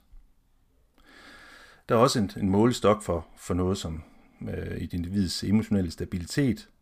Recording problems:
none

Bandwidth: 15 kHz